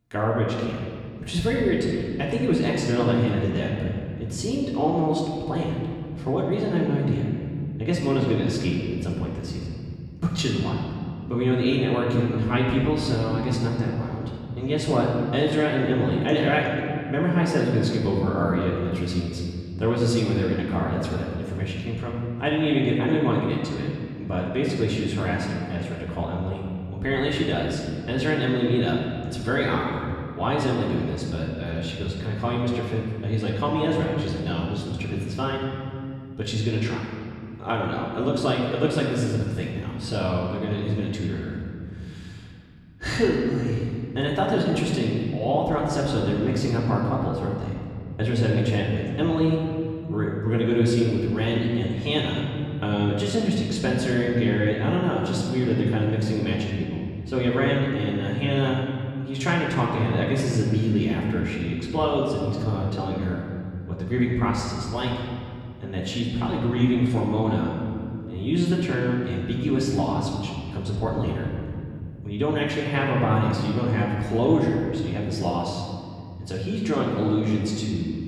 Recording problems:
off-mic speech; far
room echo; noticeable; dies away in 2.4 s

